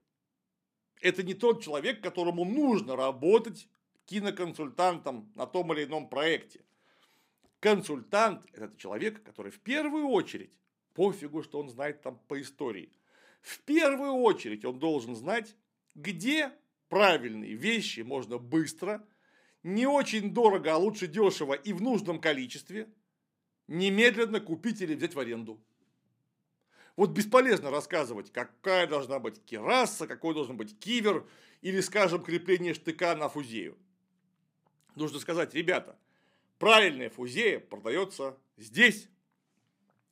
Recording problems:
none

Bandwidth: 15.5 kHz